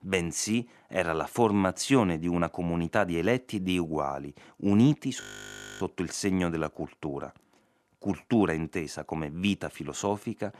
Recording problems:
audio freezing; at 5 s for 0.5 s

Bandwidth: 13.5 kHz